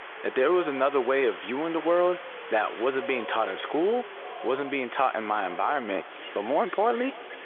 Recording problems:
echo of what is said; faint; from 4 s on; 300 ms later, 20 dB below the speech
phone-call audio; nothing above 3.5 kHz
wind in the background; noticeable; throughout; 10 dB below the speech

